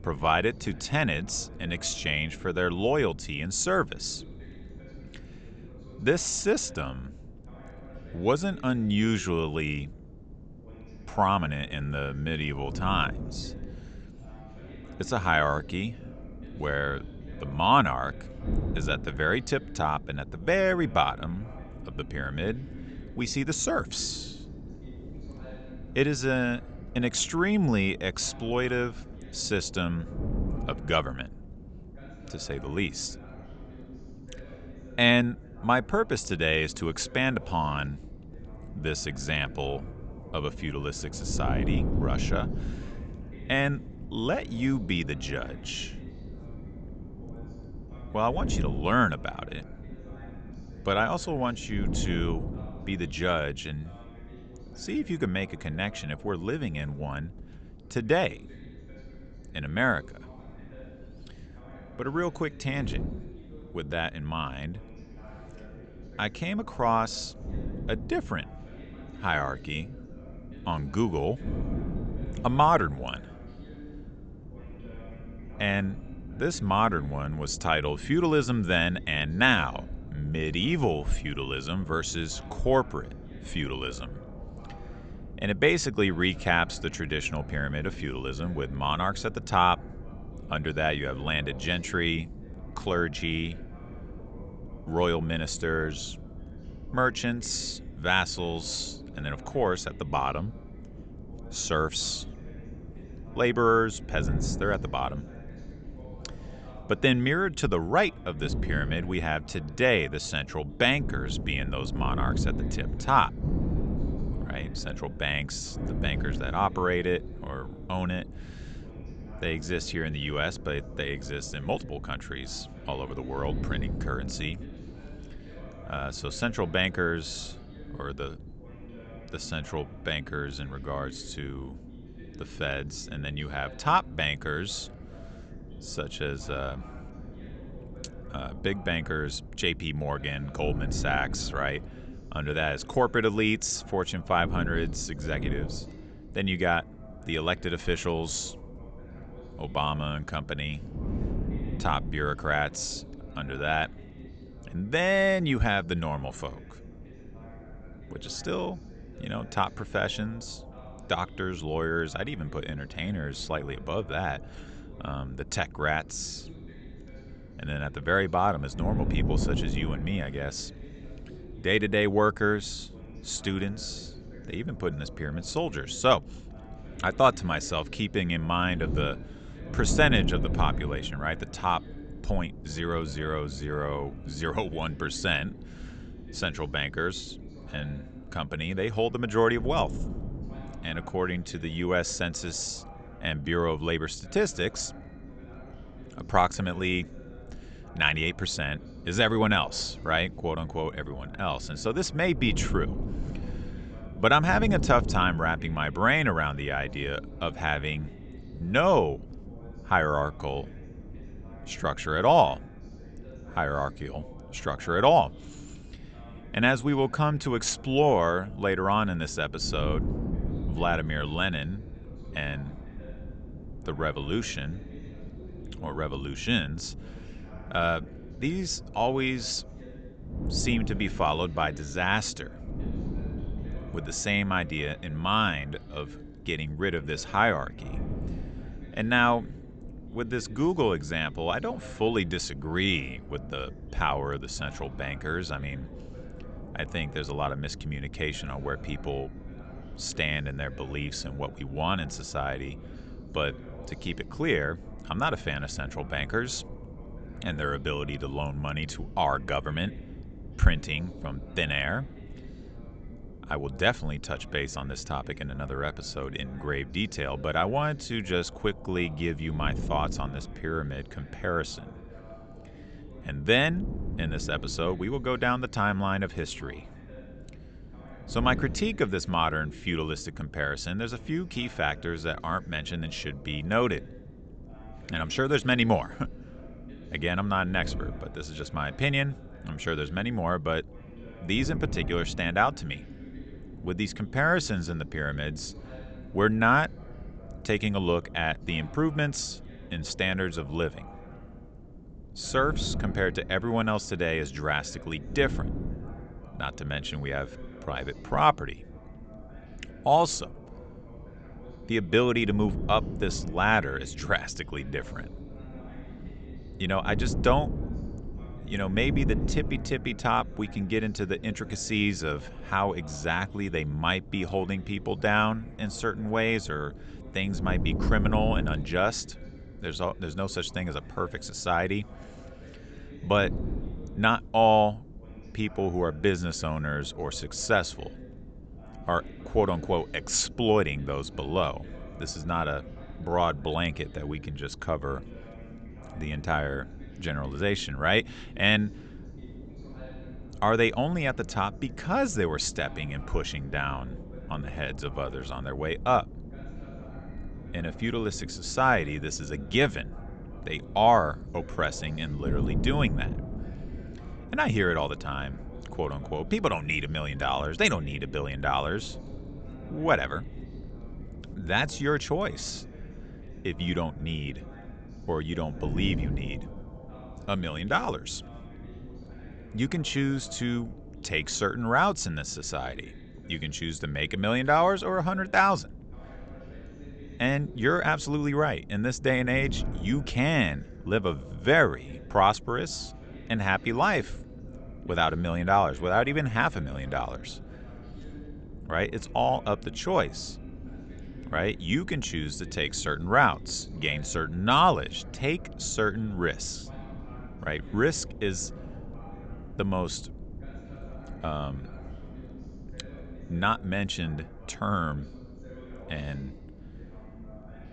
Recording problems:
high frequencies cut off; noticeable; nothing above 8 kHz
wind noise on the microphone; occasional gusts; 20 dB below the speech
voice in the background; faint; throughout; 20 dB below the speech

